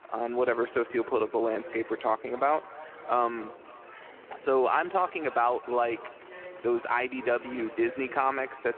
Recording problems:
echo of what is said; faint; throughout; 270 ms later, 20 dB below the speech
phone-call audio
murmuring crowd; noticeable; throughout; 20 dB below the speech
traffic noise; faint; throughout; 30 dB below the speech

